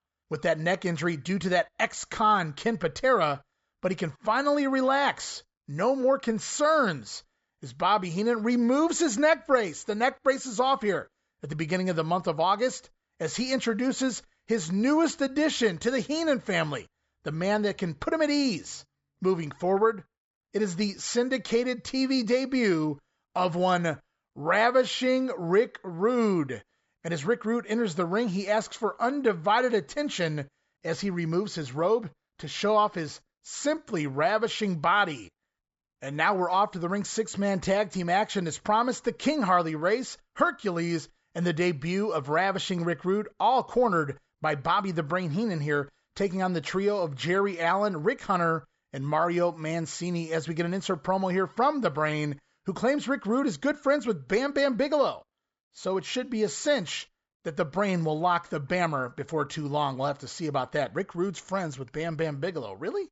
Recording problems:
high frequencies cut off; noticeable; nothing above 8 kHz

